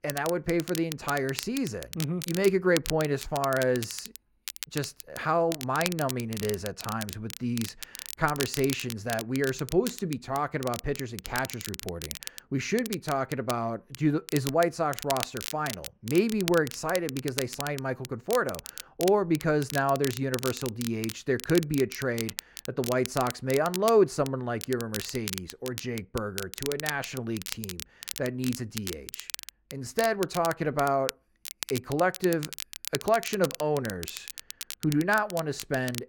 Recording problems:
muffled; slightly; fading above 3 kHz
crackle, like an old record; loud; 9 dB below the speech

